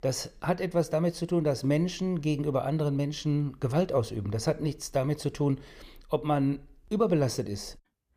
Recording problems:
none

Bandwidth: 15 kHz